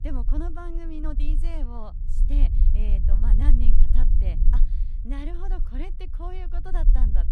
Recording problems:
low rumble; loud; throughout; 6 dB below the speech

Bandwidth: 14.5 kHz